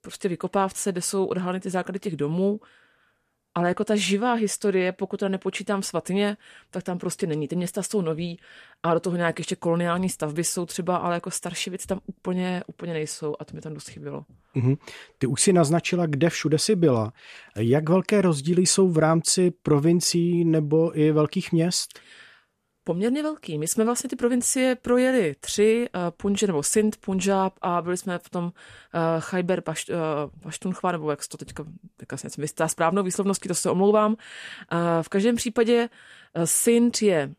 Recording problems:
none

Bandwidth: 14.5 kHz